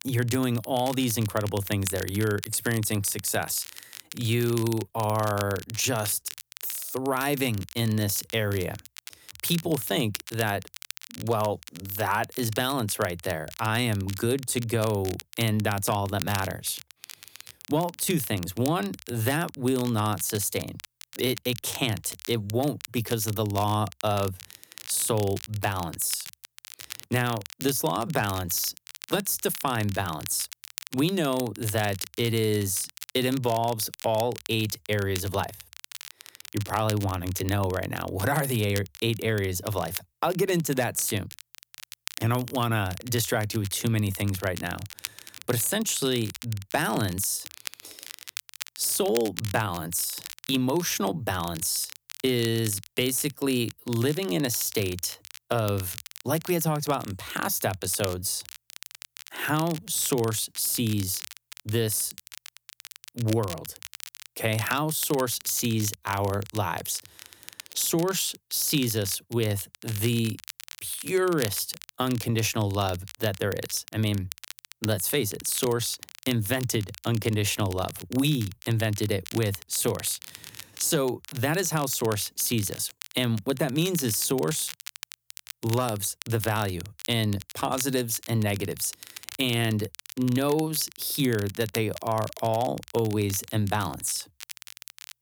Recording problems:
crackle, like an old record; noticeable; 15 dB below the speech

